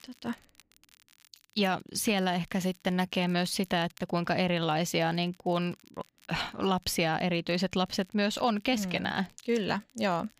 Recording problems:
crackle, like an old record; faint; 30 dB below the speech

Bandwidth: 15 kHz